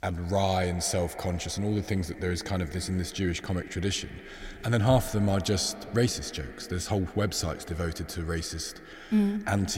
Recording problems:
echo of what is said; noticeable; throughout; 100 ms later, 15 dB below the speech
abrupt cut into speech; at the end

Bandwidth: 16 kHz